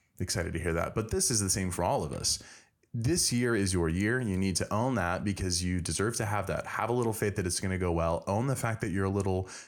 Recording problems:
none

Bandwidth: 17.5 kHz